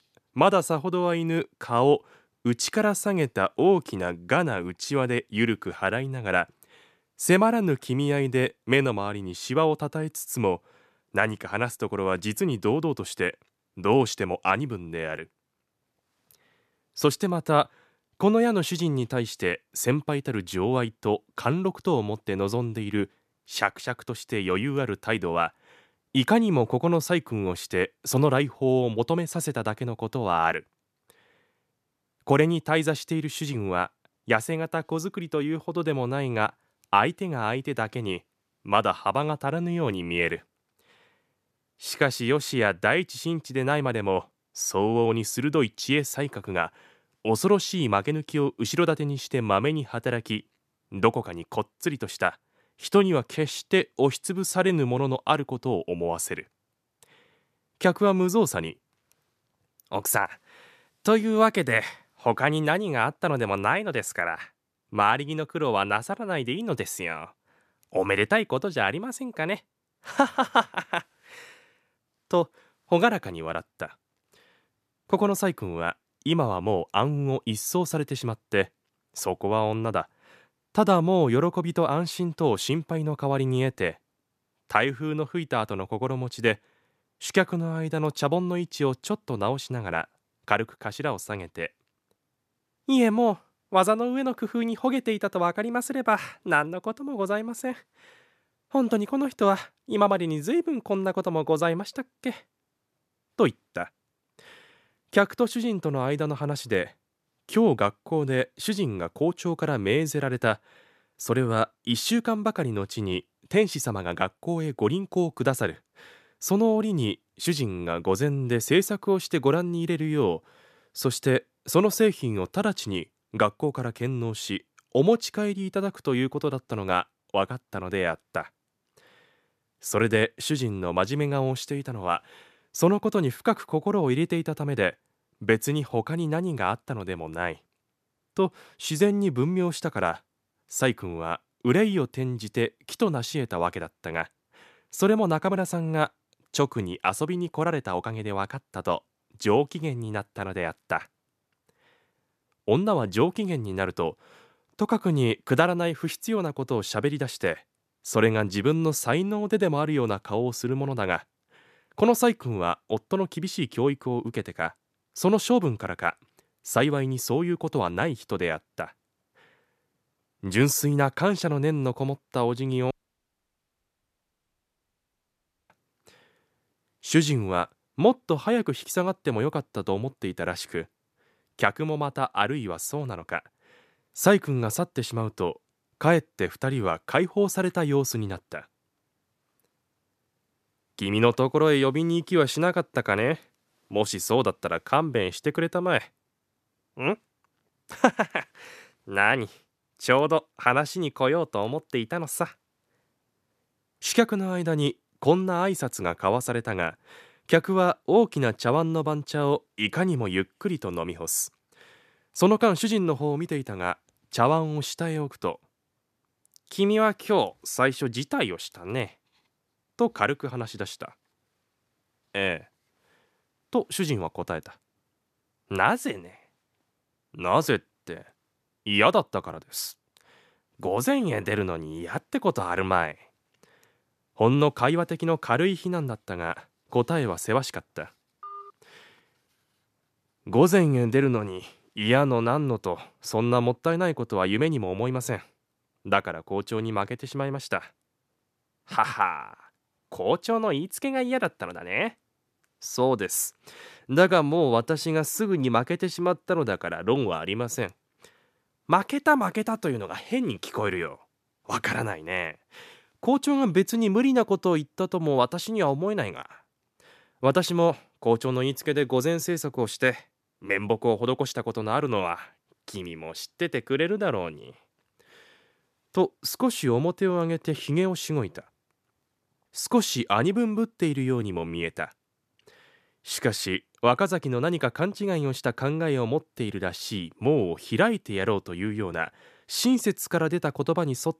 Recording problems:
audio cutting out; at 2:53 for 3 s
phone ringing; faint; at 3:58; peak 15 dB below the speech

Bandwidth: 14.5 kHz